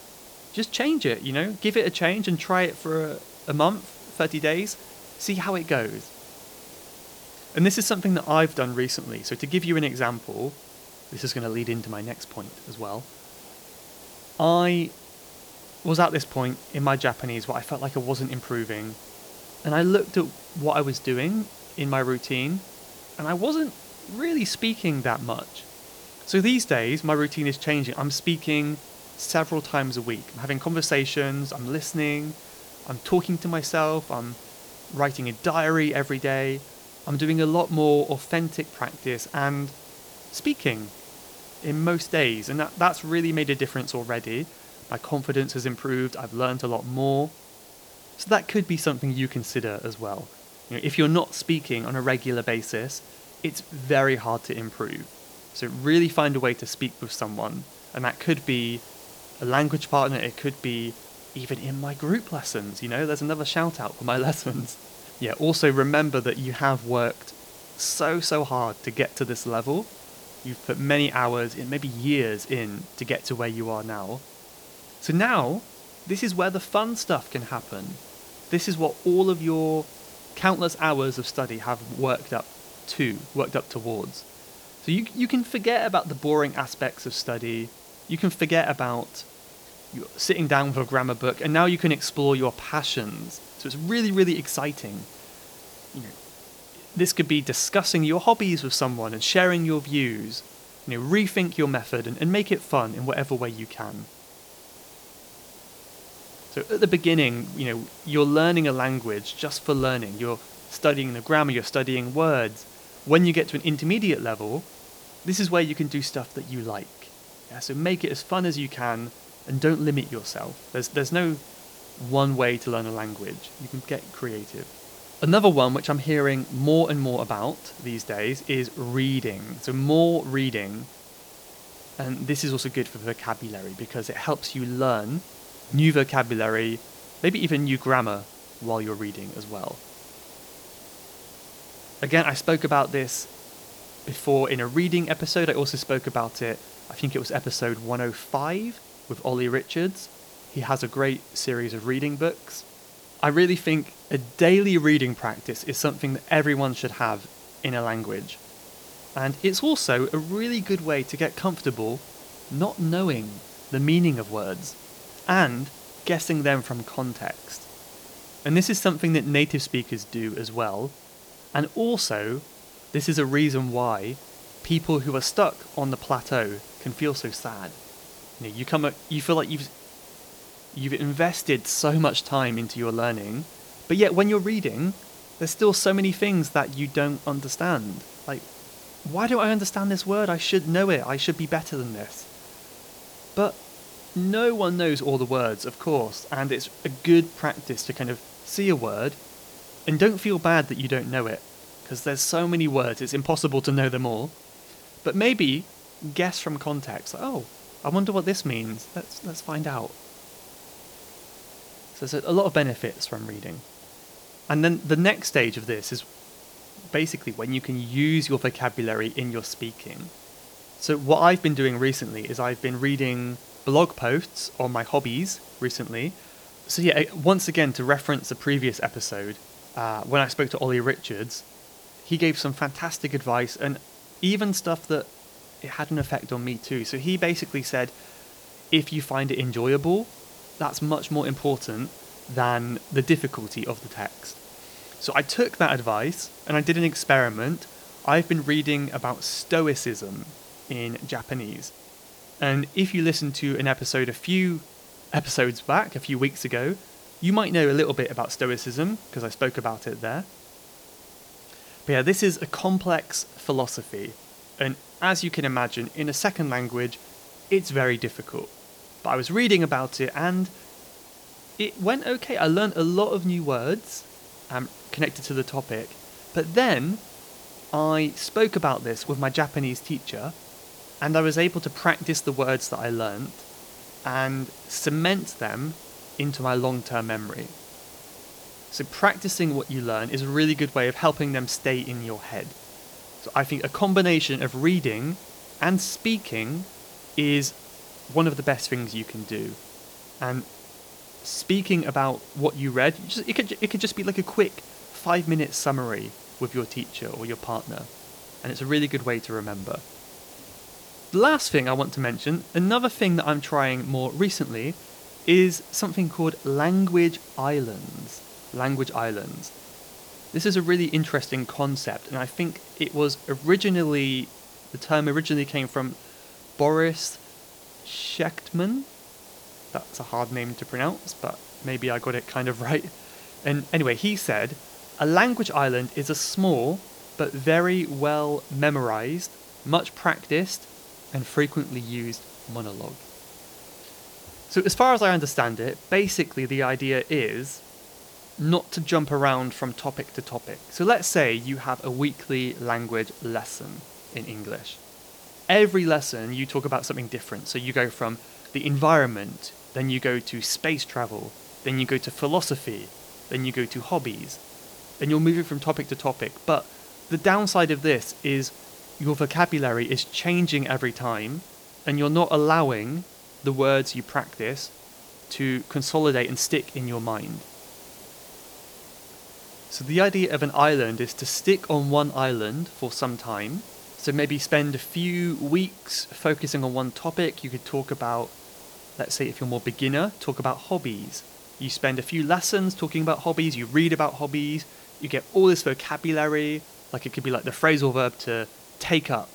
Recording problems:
hiss; noticeable; throughout; 20 dB below the speech

